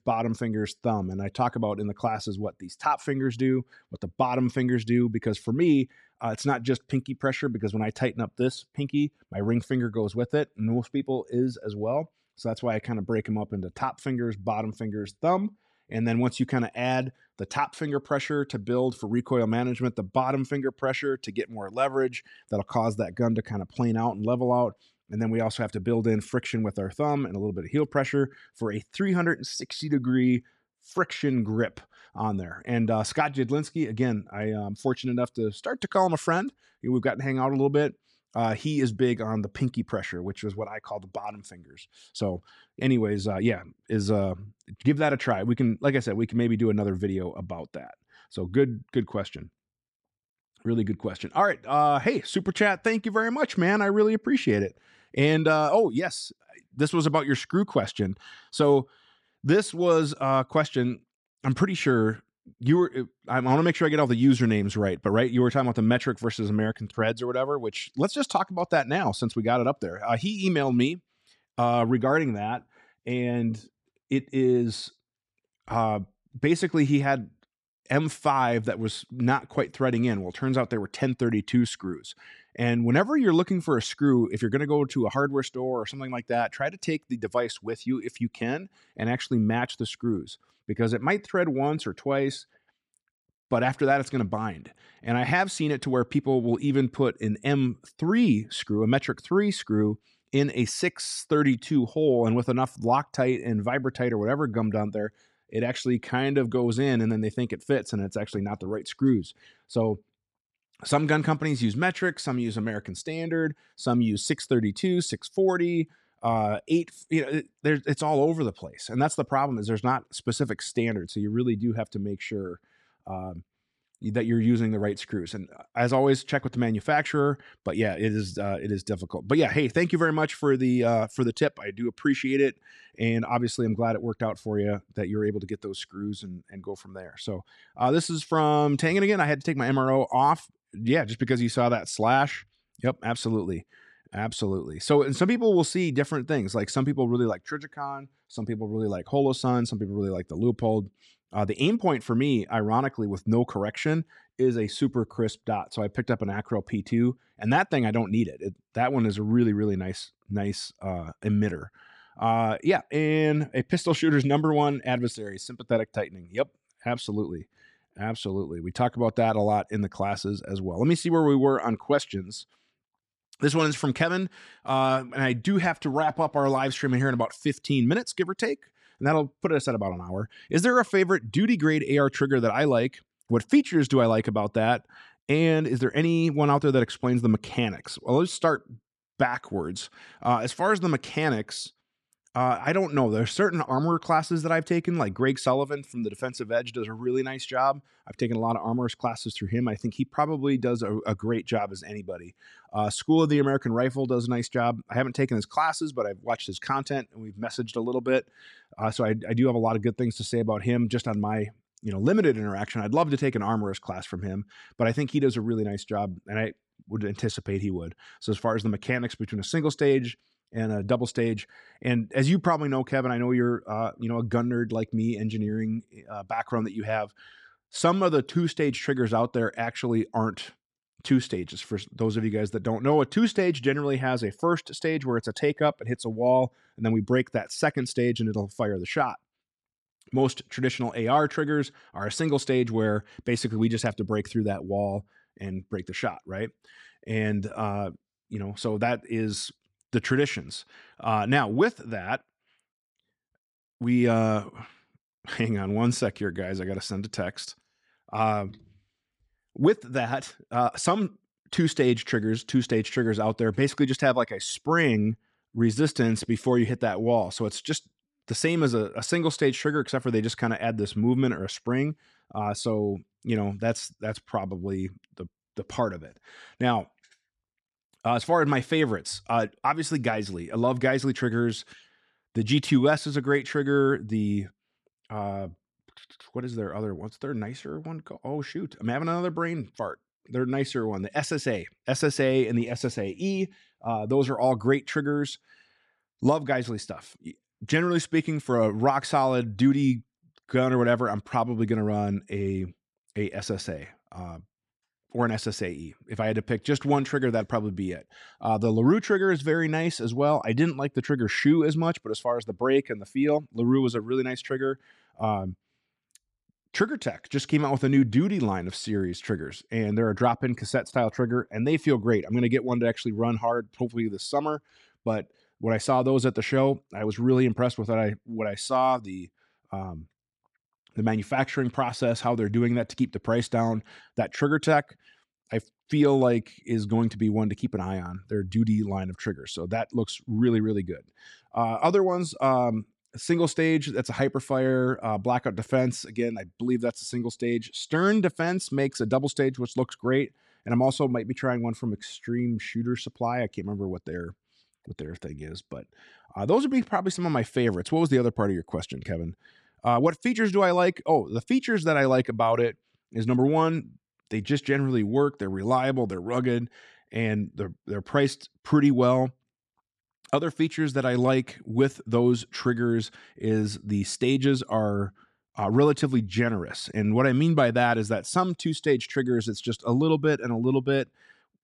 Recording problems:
none

